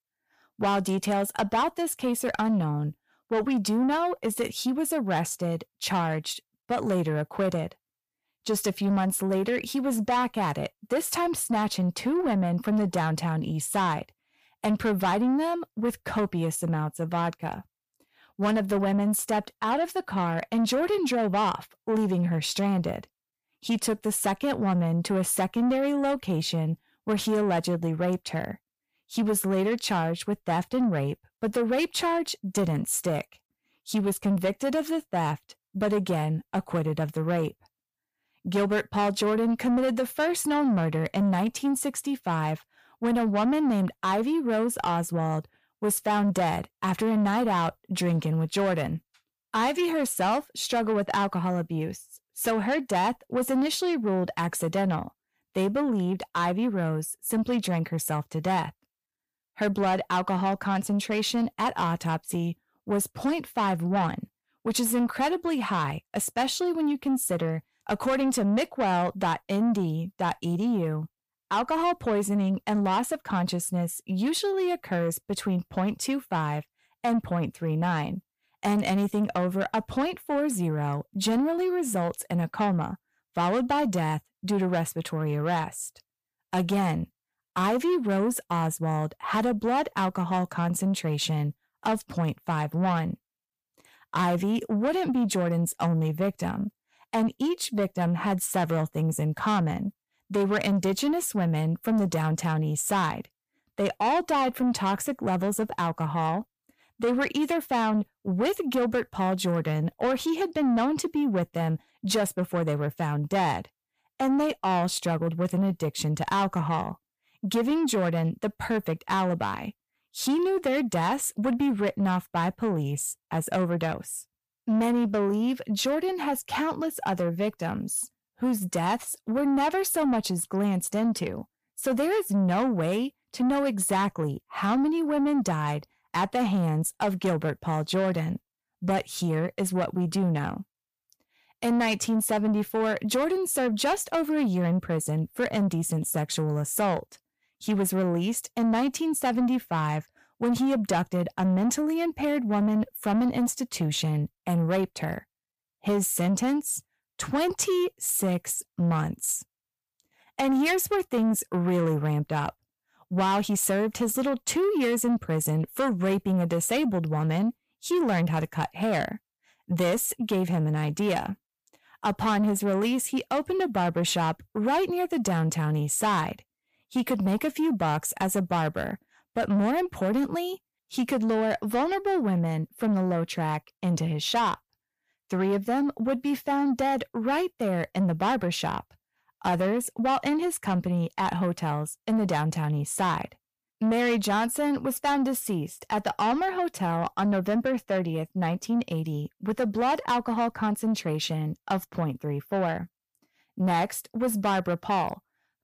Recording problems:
distortion; slight; 10 dB below the speech

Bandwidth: 15 kHz